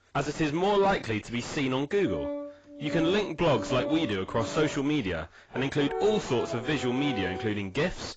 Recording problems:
distortion; heavy; 6 dB below the speech
garbled, watery; badly; nothing above 7.5 kHz
background music; loud; from 2 s on; 8 dB below the speech

